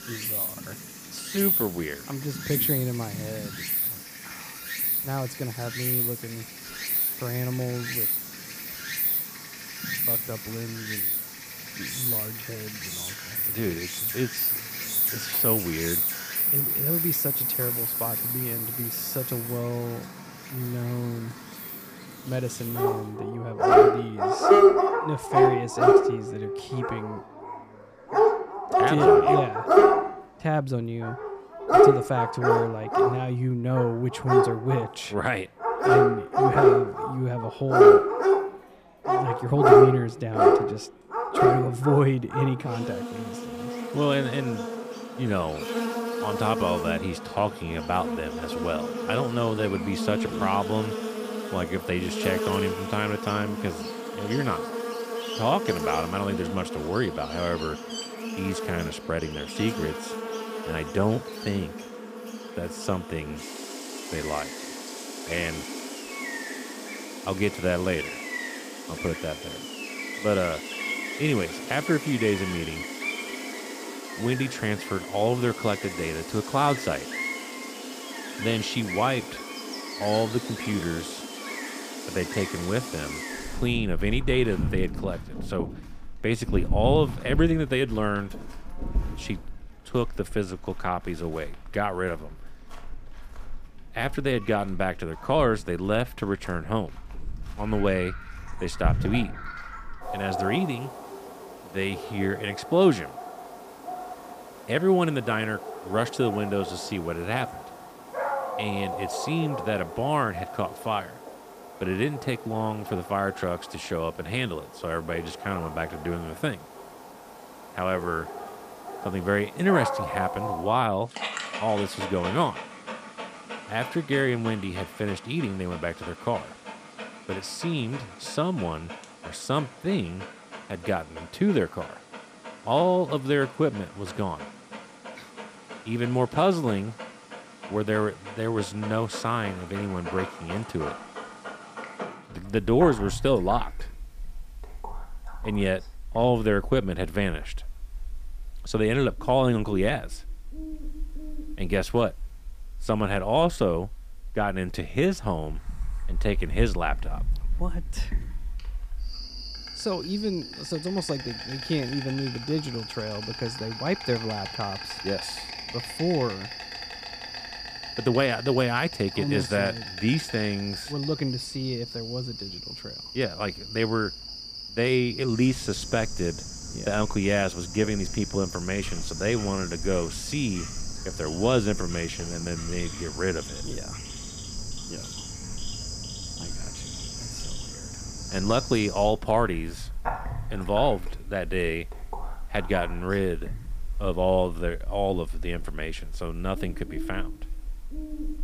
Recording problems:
animal sounds; very loud; throughout; as loud as the speech

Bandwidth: 15 kHz